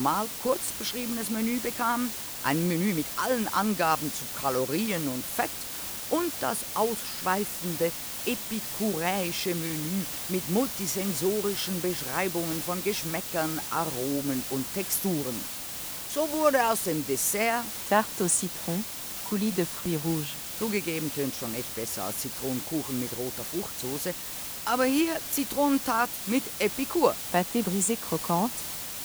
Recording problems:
hiss; loud; throughout; 4 dB below the speech
abrupt cut into speech; at the start
uneven, jittery; strongly; from 2.5 to 25 s

